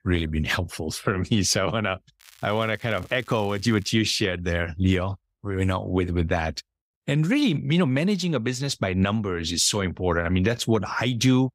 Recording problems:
crackling; faint; from 2 to 4 s; 25 dB below the speech

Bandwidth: 15.5 kHz